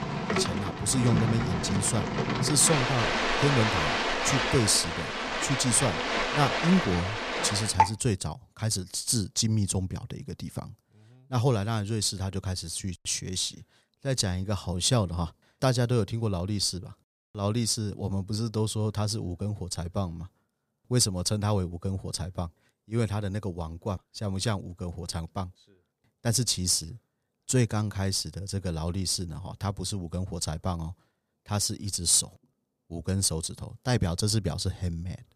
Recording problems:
rain or running water; loud; until 7.5 s; as loud as the speech

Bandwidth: 15 kHz